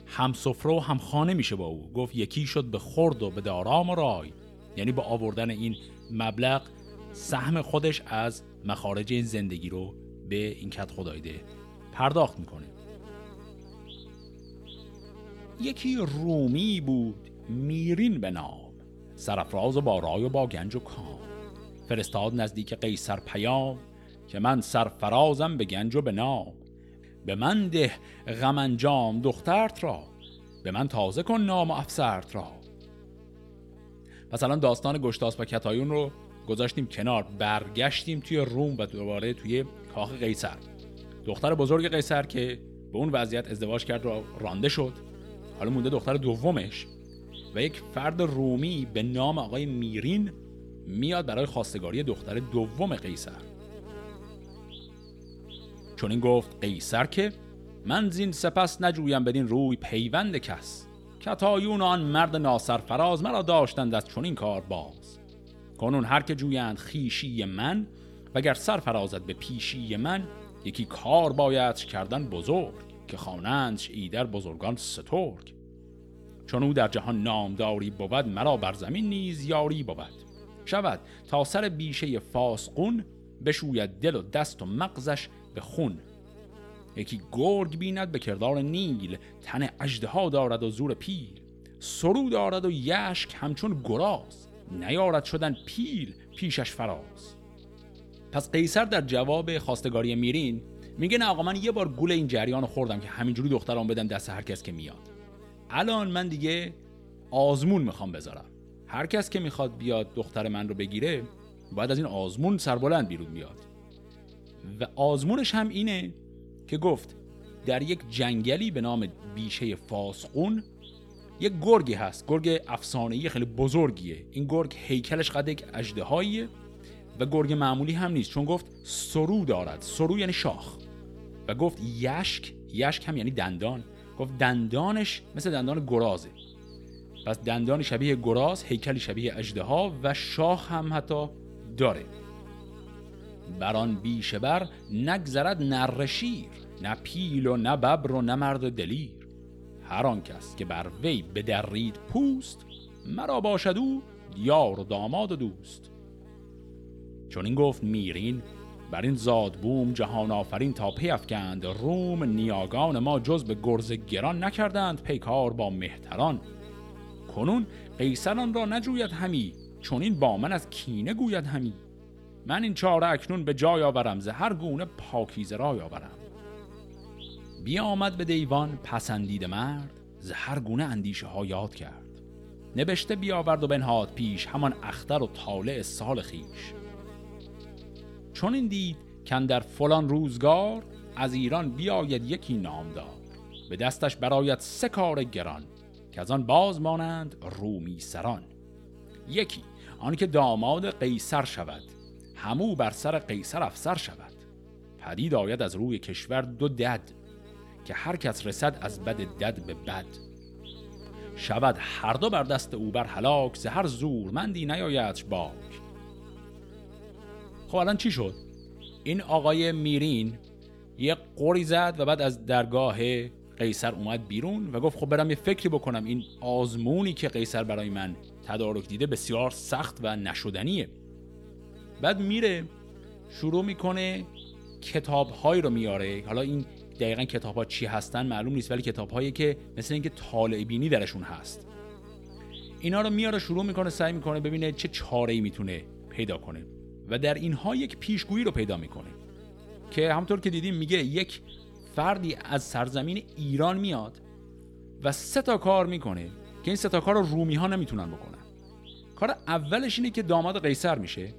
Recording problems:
electrical hum; faint; throughout; 60 Hz, 20 dB below the speech

